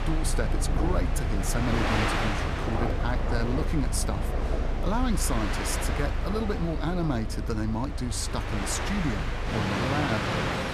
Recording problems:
train or aircraft noise; very loud; throughout; 1 dB above the speech

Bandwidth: 14 kHz